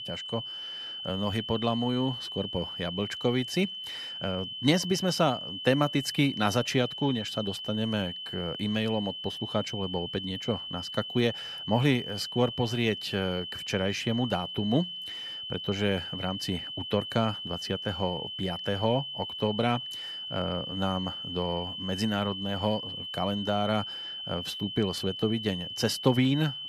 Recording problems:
high-pitched whine; loud; throughout; 3 kHz, 6 dB below the speech

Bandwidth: 14 kHz